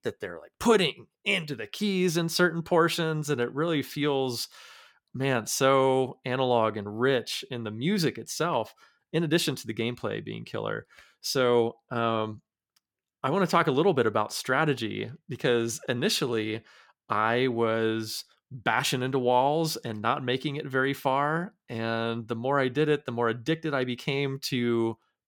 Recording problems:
none

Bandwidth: 17.5 kHz